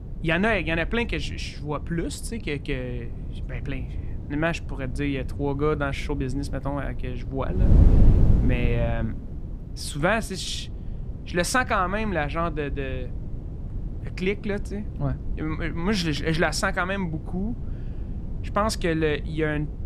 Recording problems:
wind noise on the microphone; occasional gusts; 15 dB below the speech

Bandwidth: 15 kHz